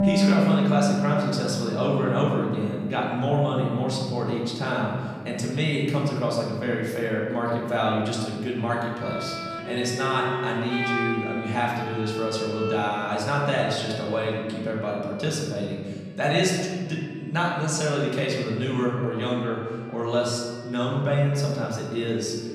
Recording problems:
off-mic speech; far
room echo; noticeable; dies away in 1.7 s
background music; very faint; throughout; 2 dB below the speech

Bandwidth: 15.5 kHz